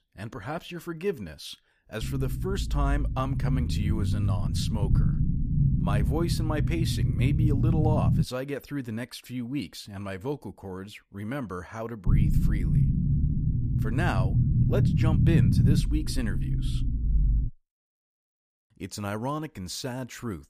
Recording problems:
low rumble; loud; from 2 to 8 s and from 12 to 17 s; 2 dB below the speech

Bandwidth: 15 kHz